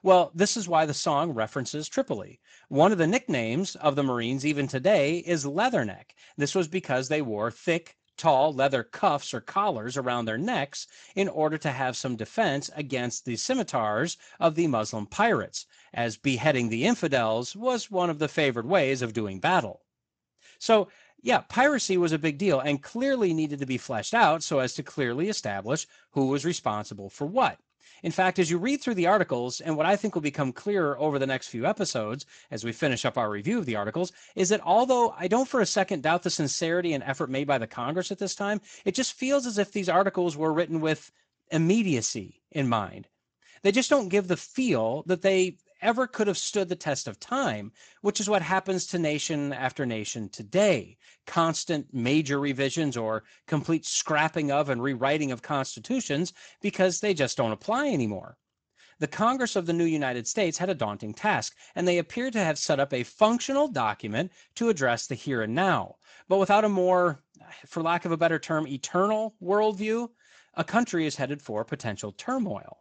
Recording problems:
garbled, watery; slightly; nothing above 7.5 kHz

